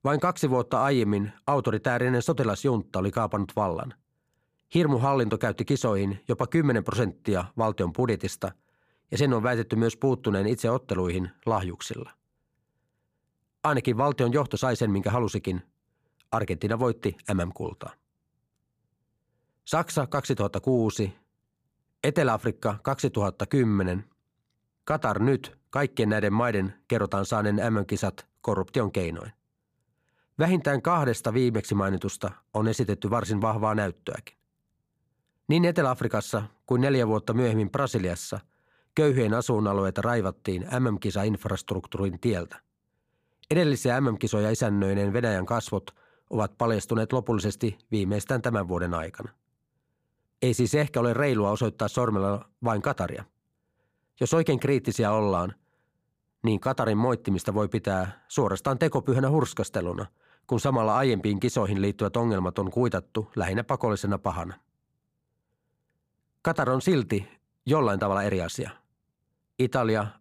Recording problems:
none

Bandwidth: 15 kHz